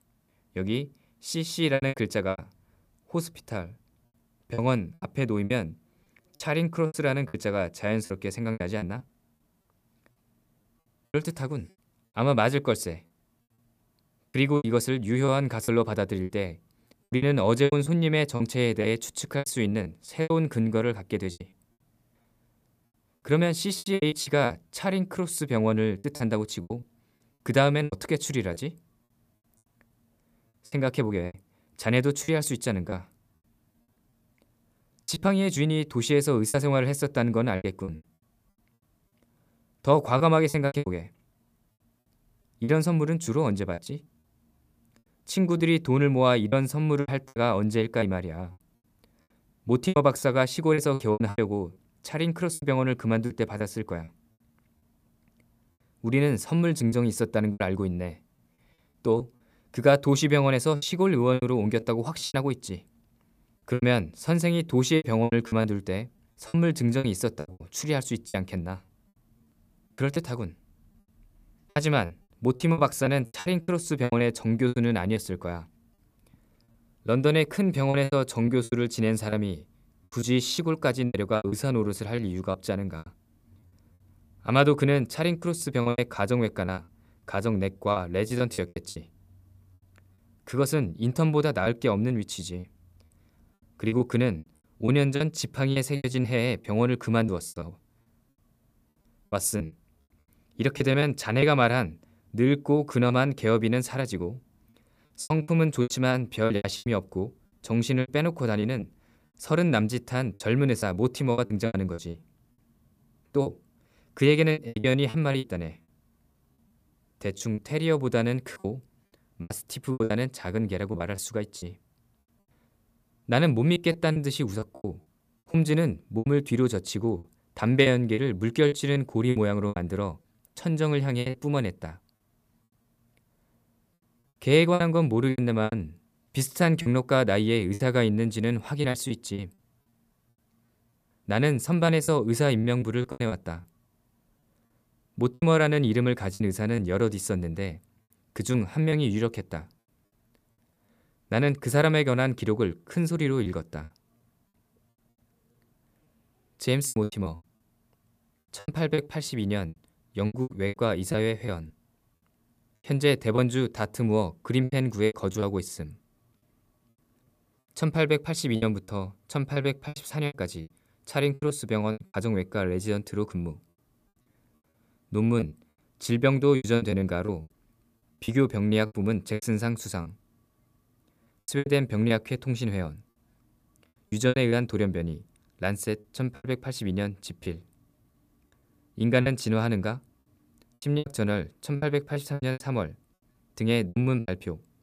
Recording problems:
choppy; very; 11% of the speech affected

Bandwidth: 15 kHz